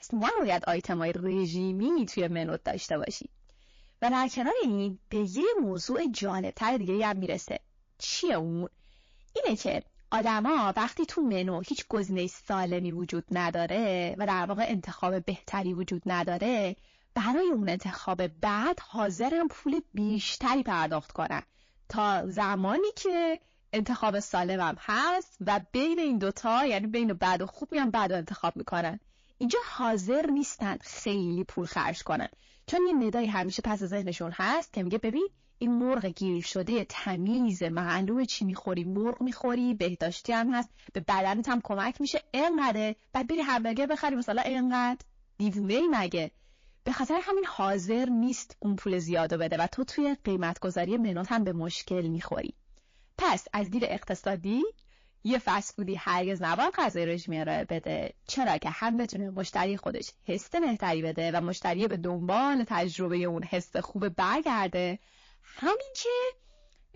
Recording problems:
distortion; slight; 10 dB below the speech
garbled, watery; slightly

